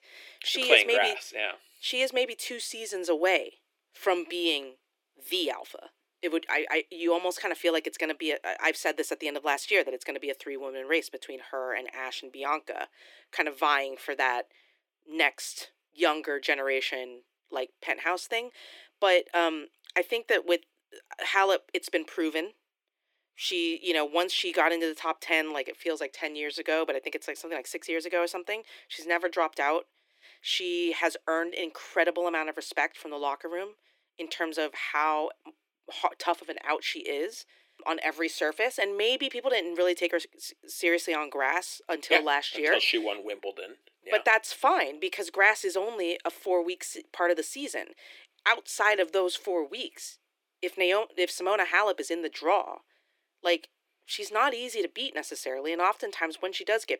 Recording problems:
thin; very; fading below 300 Hz

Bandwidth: 17 kHz